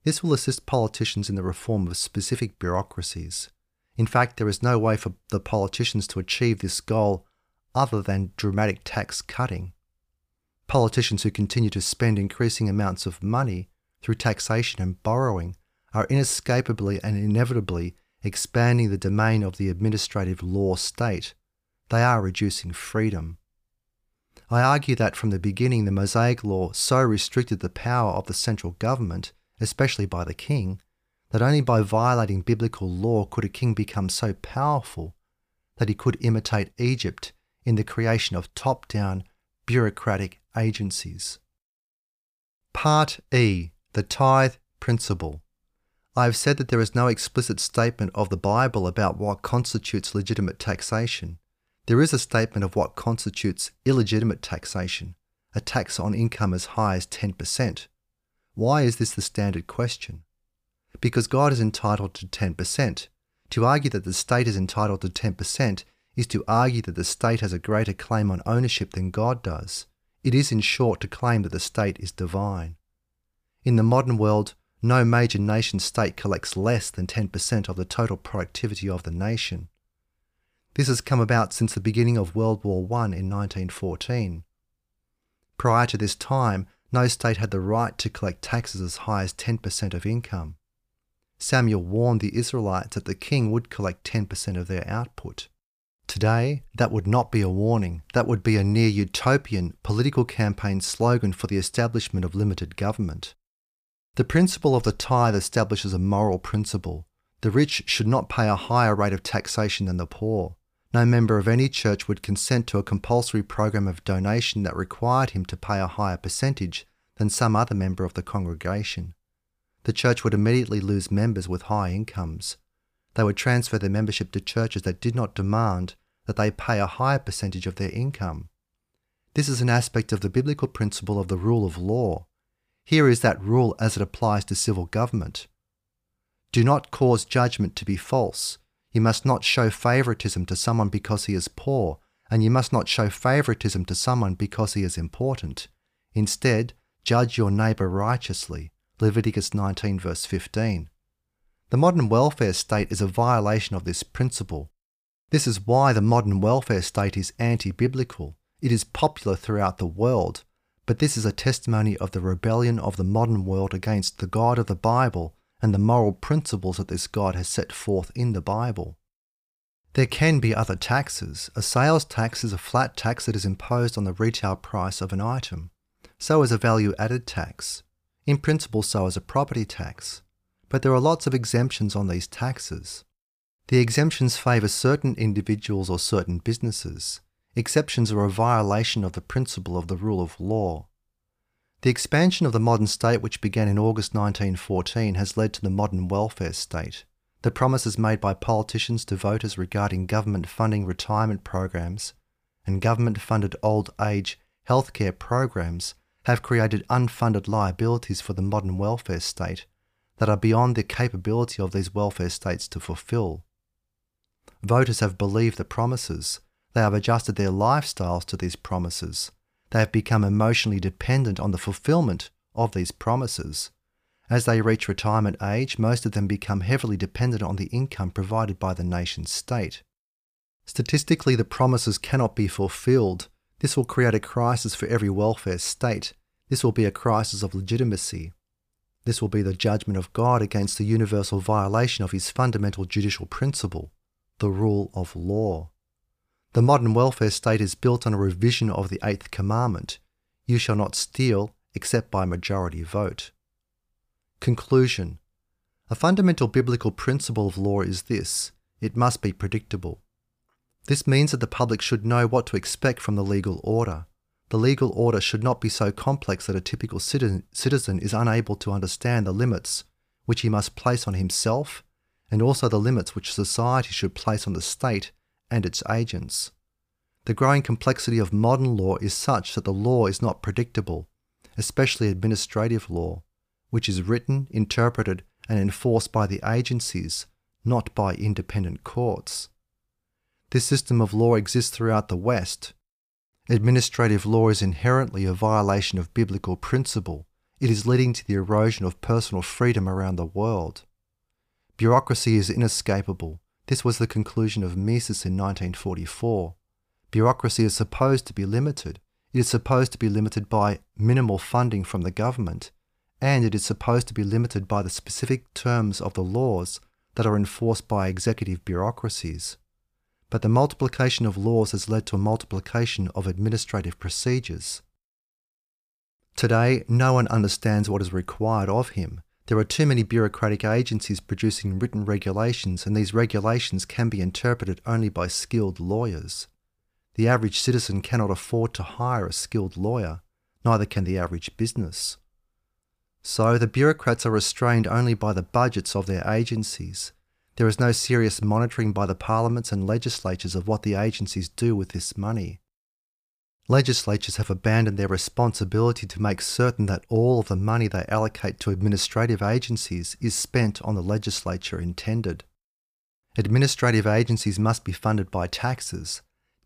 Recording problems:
none

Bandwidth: 15 kHz